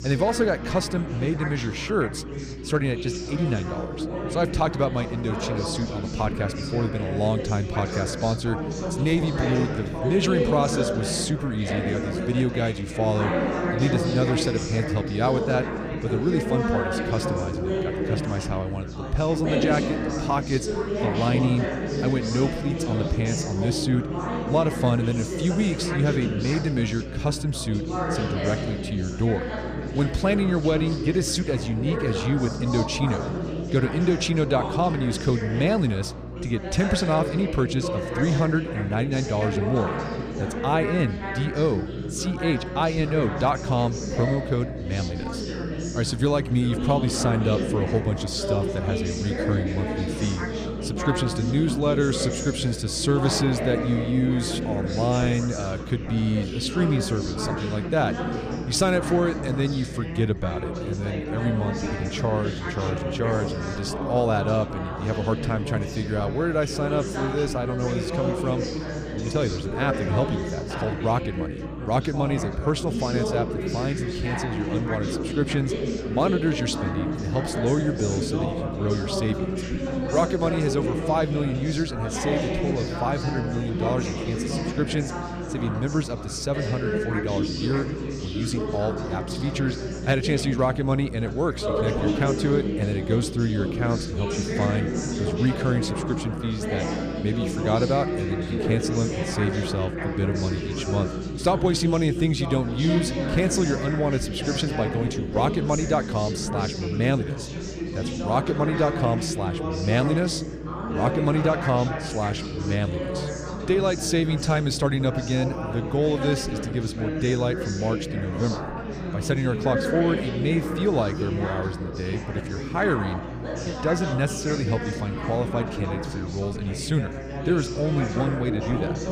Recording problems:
chatter from many people; loud; throughout; 3 dB below the speech
electrical hum; noticeable; throughout; 60 Hz, 20 dB below the speech

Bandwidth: 15 kHz